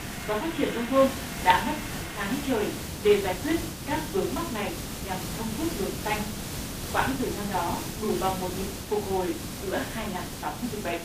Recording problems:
phone-call audio; poor line; nothing above 4 kHz
off-mic speech; far
room echo; slight; dies away in 0.3 s
hiss; loud; throughout; 6 dB below the speech
household noises; noticeable; until 7 s; 10 dB below the speech

